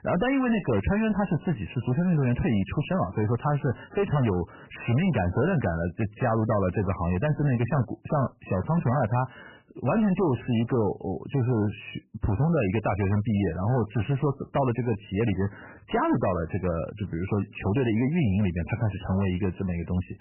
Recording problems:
garbled, watery; badly; nothing above 3 kHz
distortion; slight; 15% of the sound clipped

